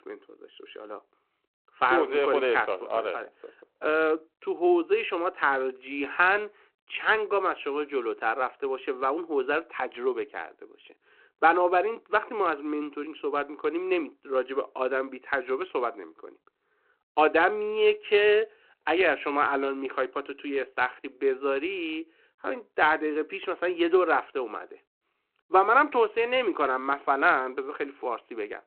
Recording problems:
phone-call audio

